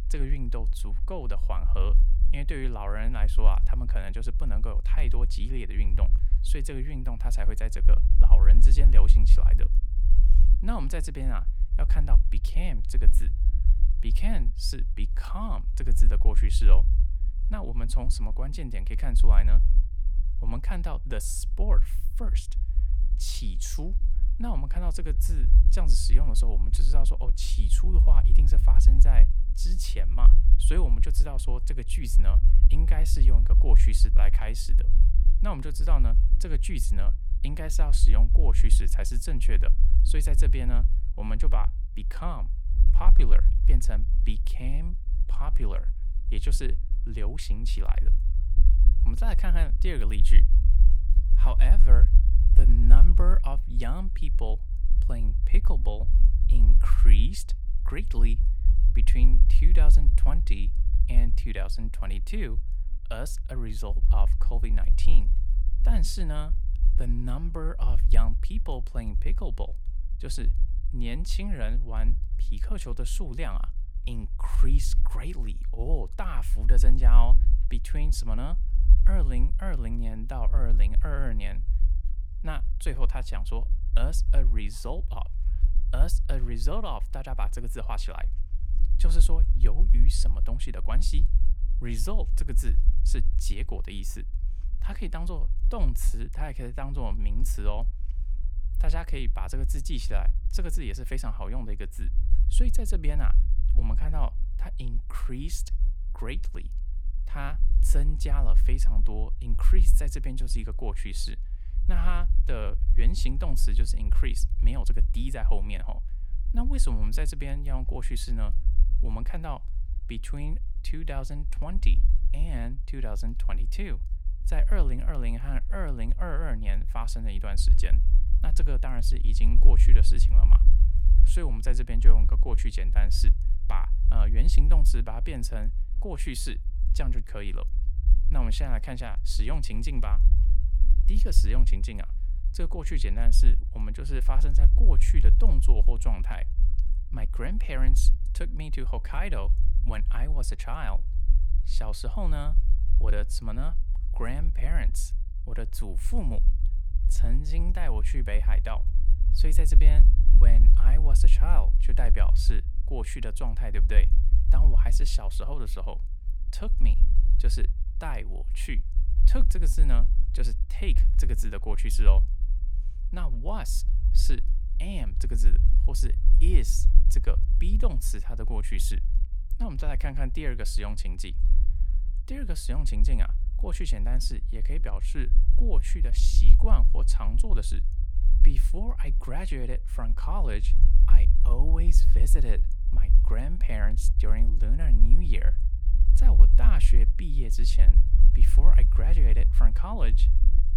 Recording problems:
low rumble; noticeable; throughout; 10 dB below the speech

